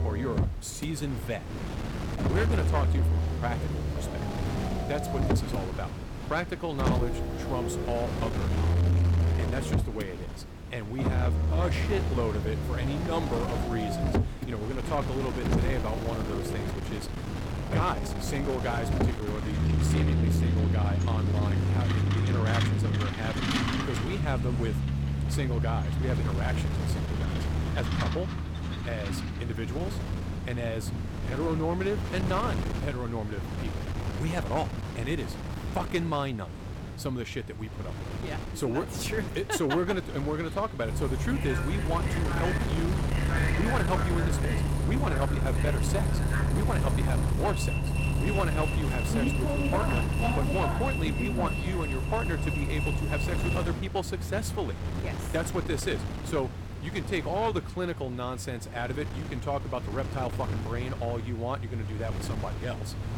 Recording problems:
distortion; slight; 8% of the sound clipped
traffic noise; very loud; throughout; 3 dB above the speech
wind noise on the microphone; heavy; 7 dB below the speech

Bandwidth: 17 kHz